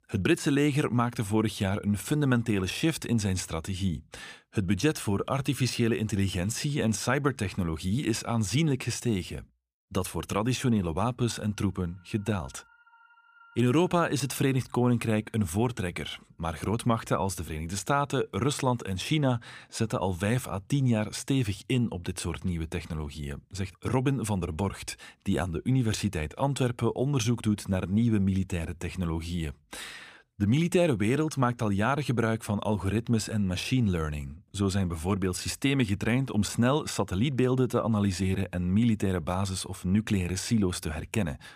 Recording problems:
none

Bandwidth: 15 kHz